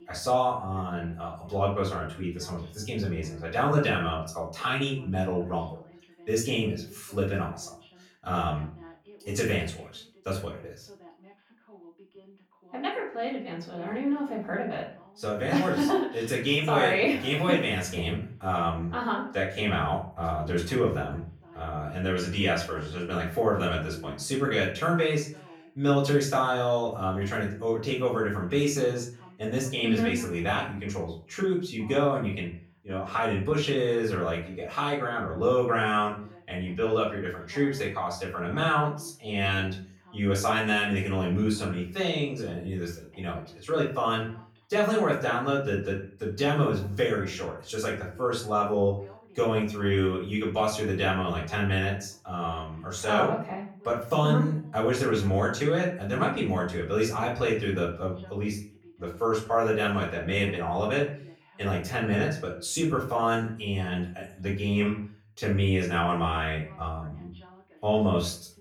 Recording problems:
off-mic speech; far
room echo; noticeable; dies away in 0.4 s
voice in the background; faint; throughout; 25 dB below the speech

